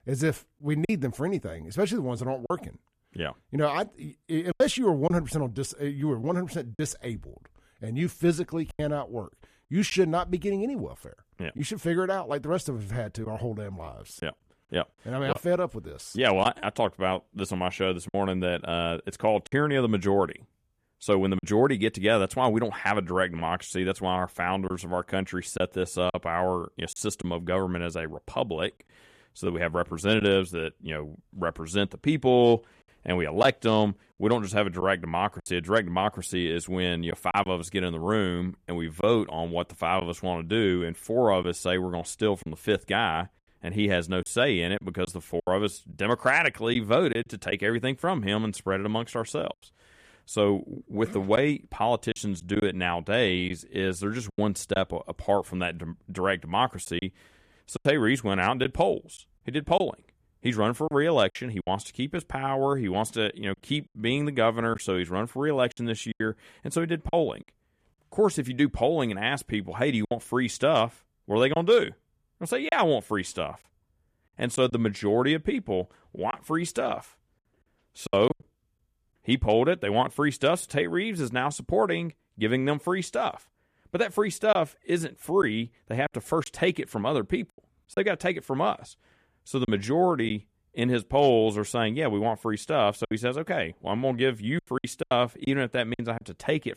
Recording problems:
choppy; occasionally; 4% of the speech affected

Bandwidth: 14.5 kHz